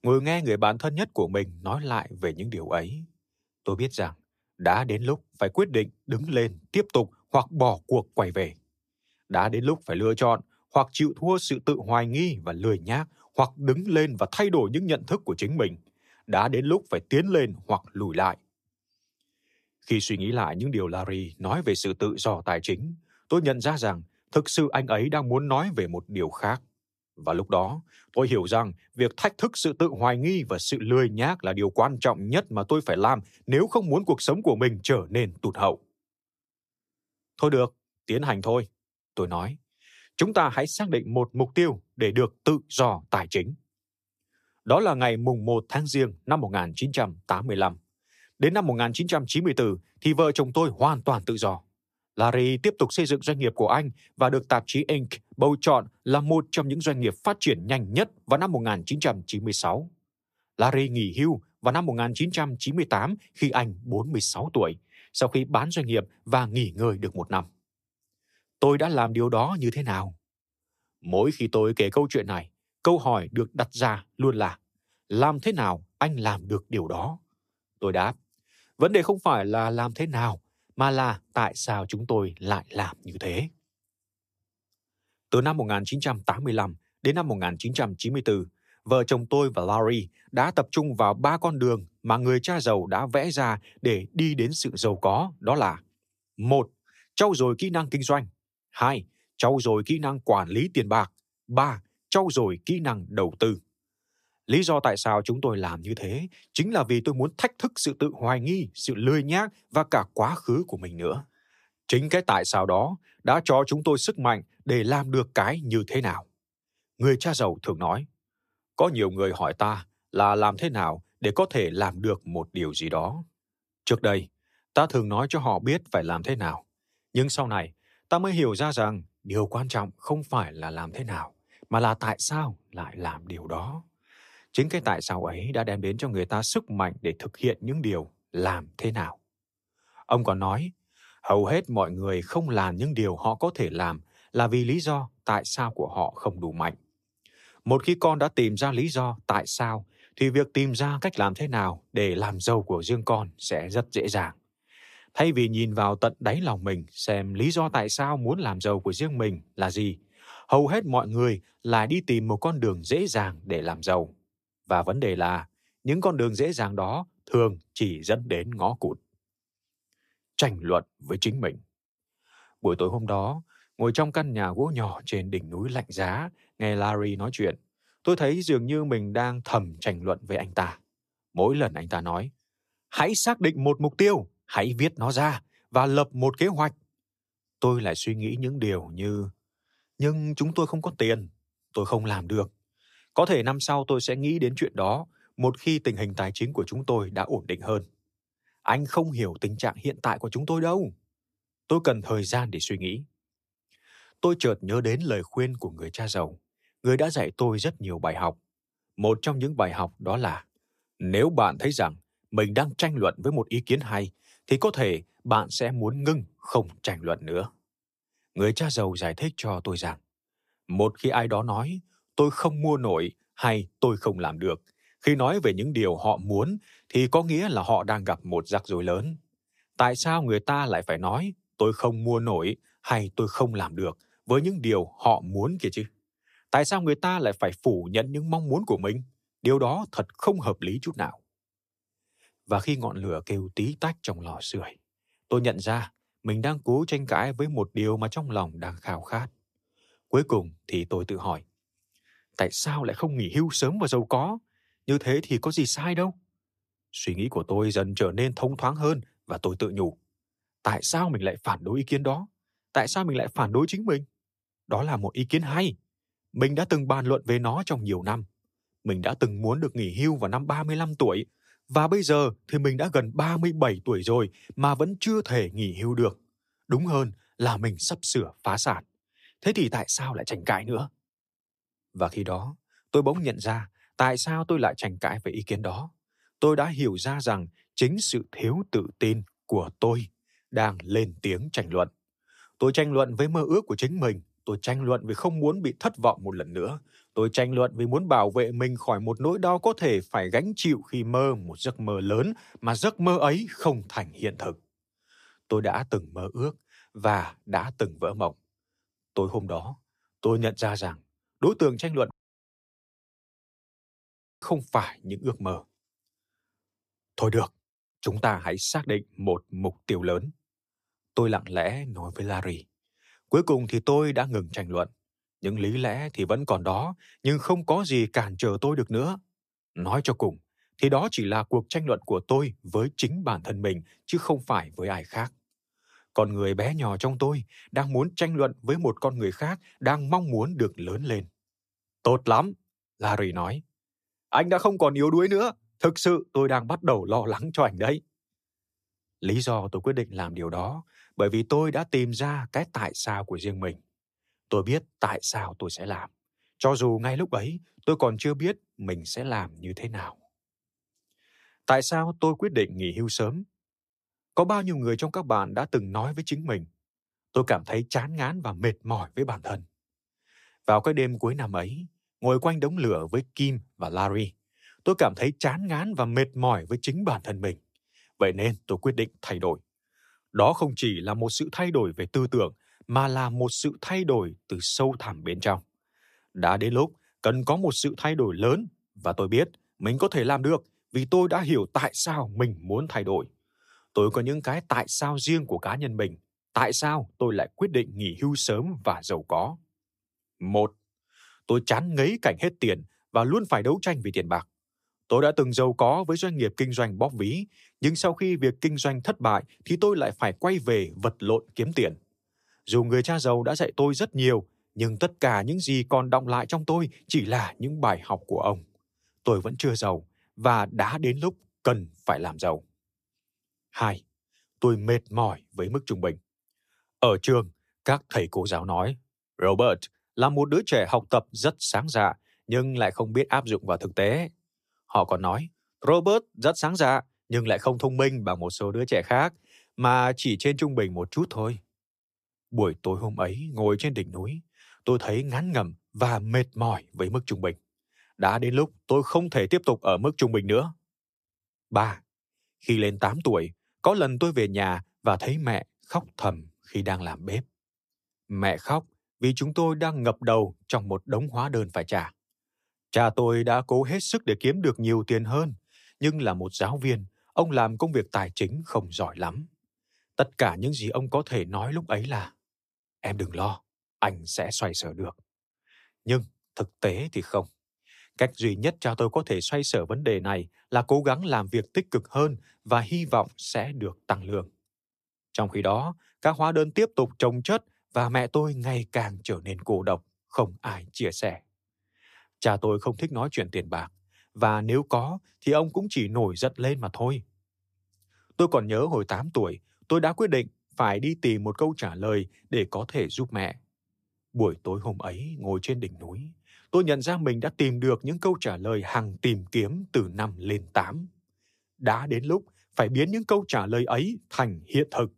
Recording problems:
audio cutting out; at 5:12 for 2.5 s

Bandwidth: 14.5 kHz